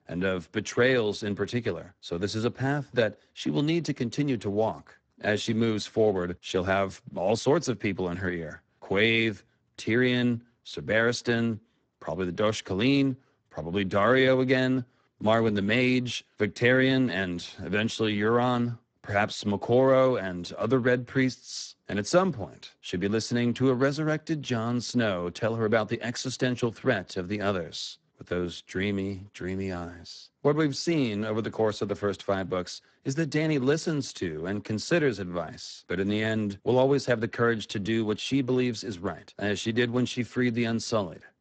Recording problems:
garbled, watery; badly; nothing above 8 kHz

